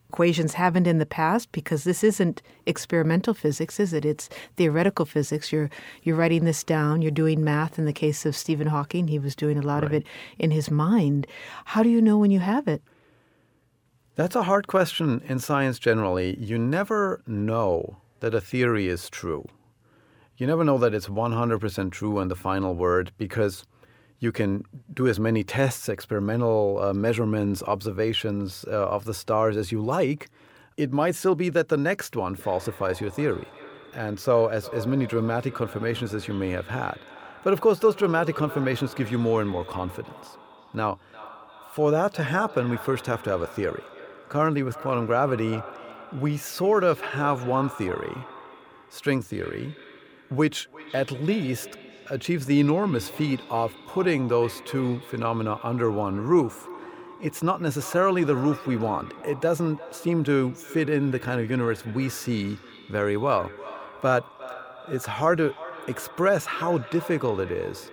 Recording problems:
echo of what is said; noticeable; from 32 s on; 350 ms later, 15 dB below the speech

